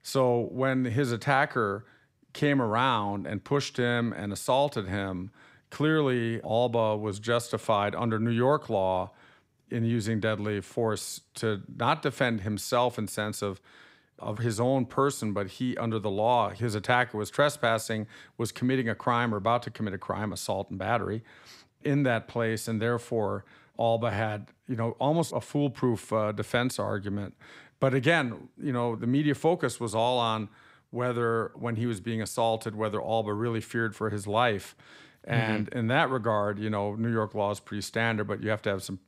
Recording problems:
none

